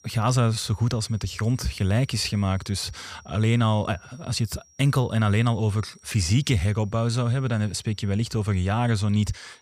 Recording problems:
high-pitched whine; faint; throughout; 5.5 kHz, 30 dB below the speech

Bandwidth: 15 kHz